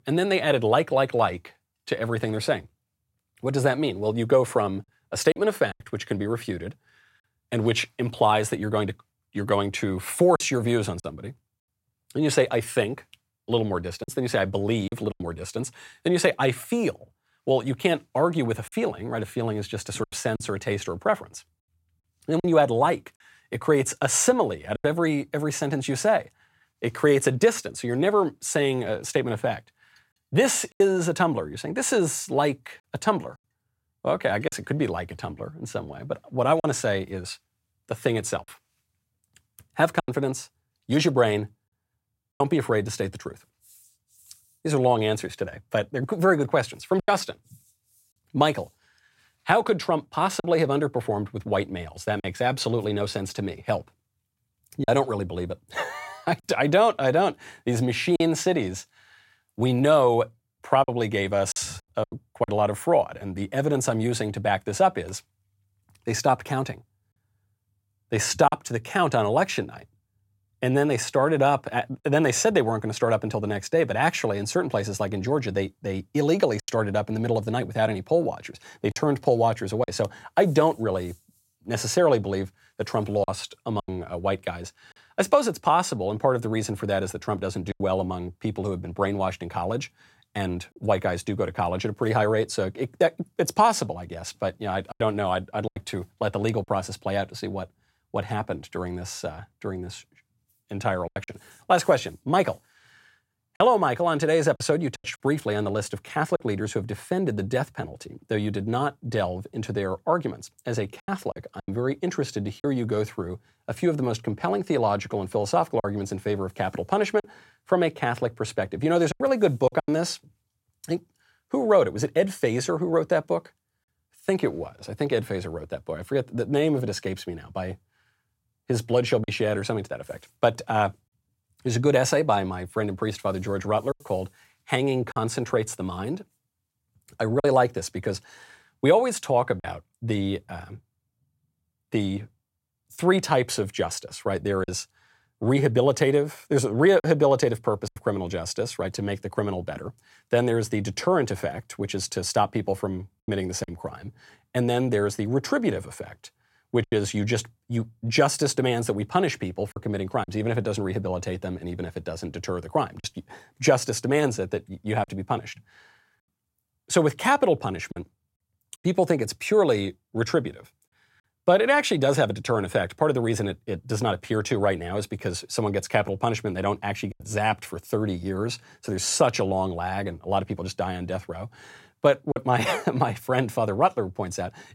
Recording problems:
choppy; occasionally; 3% of the speech affected

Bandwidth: 16 kHz